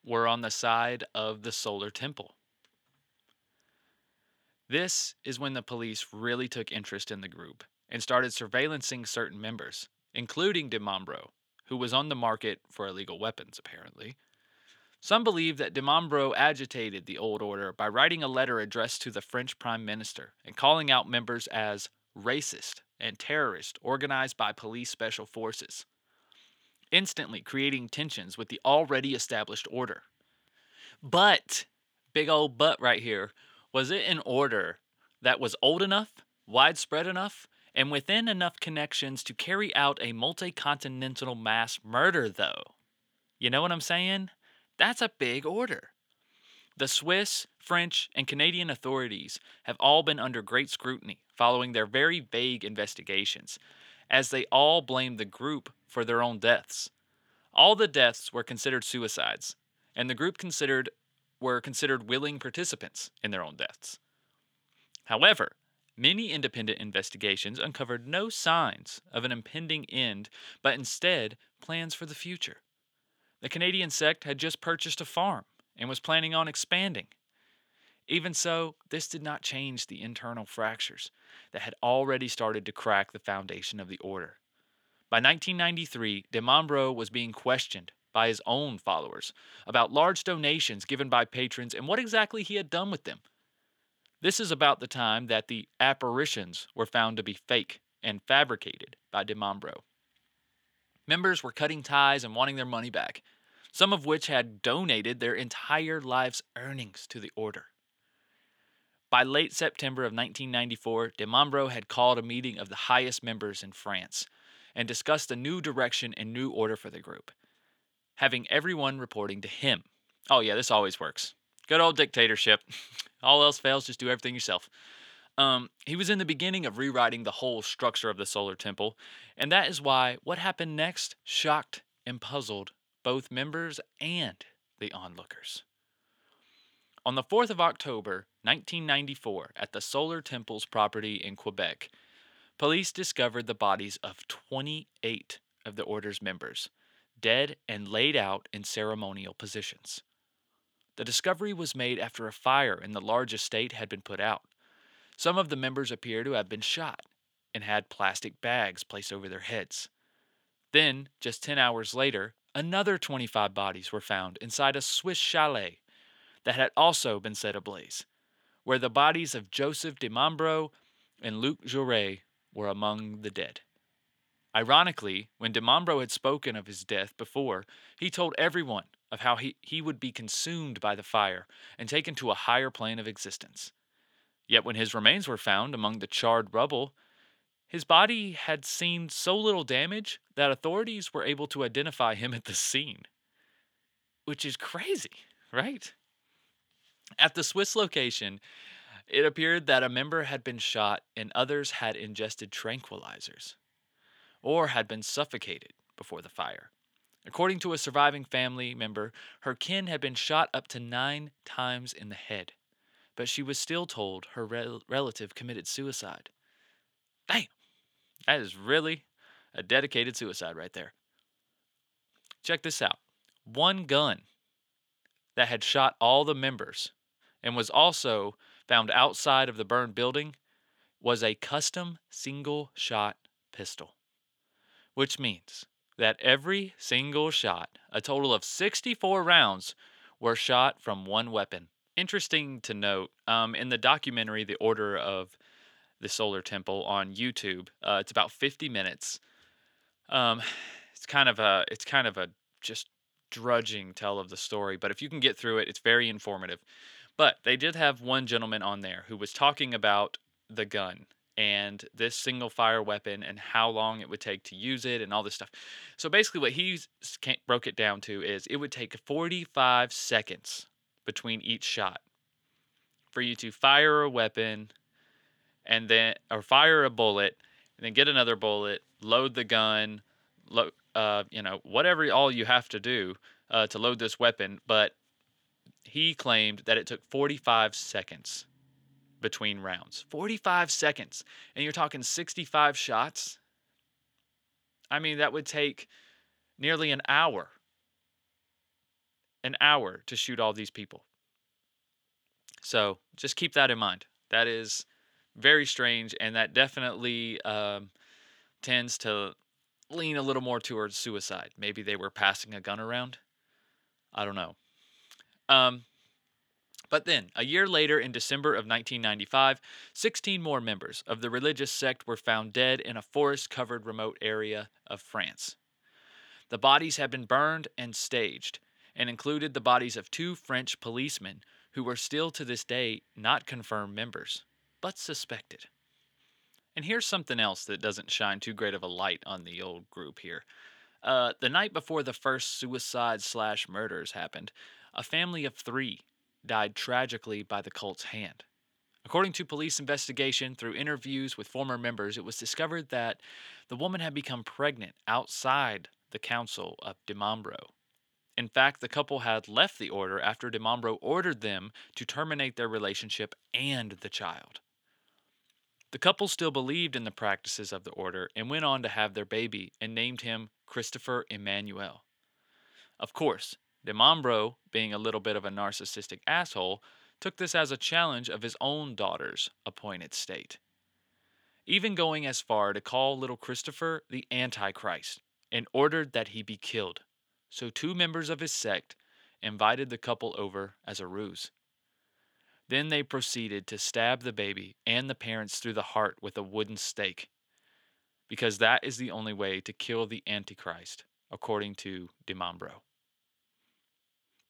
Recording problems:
thin; somewhat; fading below 1 kHz

